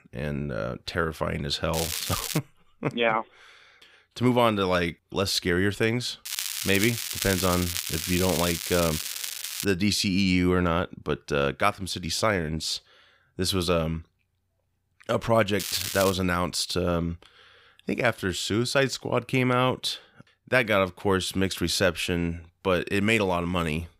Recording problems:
crackling; loud; at 1.5 s, from 6.5 to 9.5 s and at 16 s; 4 dB below the speech

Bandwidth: 15.5 kHz